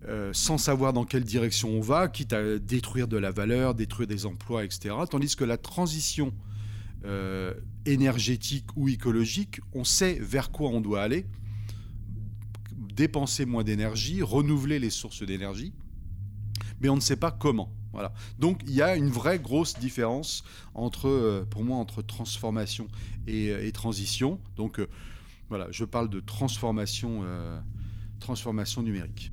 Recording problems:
low rumble; faint; throughout; 25 dB below the speech

